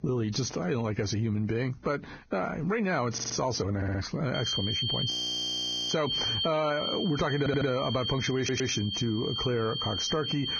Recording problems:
garbled, watery; badly; nothing above 6.5 kHz
squashed, flat; heavily
high-pitched whine; loud; from 4.5 s on; 3 kHz, 1 dB below the speech
audio stuttering; 4 times, first at 3 s
audio freezing; at 5 s for 1 s

